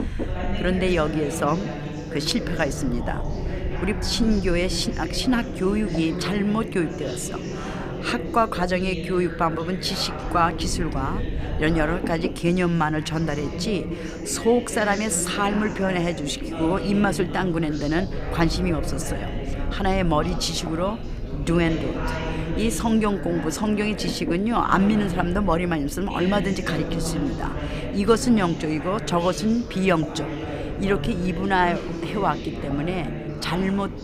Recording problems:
background chatter; loud; throughout; 2 voices, 8 dB below the speech
low rumble; noticeable; throughout; 15 dB below the speech

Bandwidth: 15.5 kHz